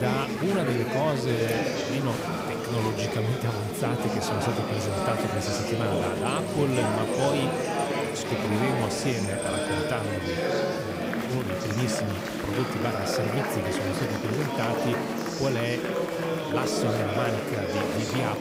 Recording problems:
chatter from many people; very loud; throughout; 2 dB above the speech
hiss; faint; throughout; 25 dB below the speech
abrupt cut into speech; at the start

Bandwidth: 15.5 kHz